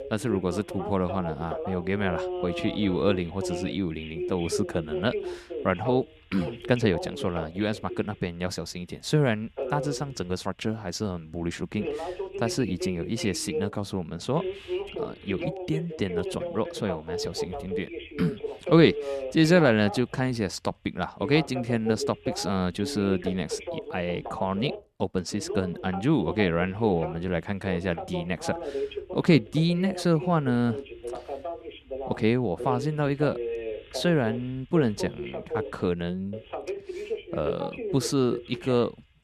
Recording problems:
voice in the background; loud; throughout; 8 dB below the speech

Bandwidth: 13.5 kHz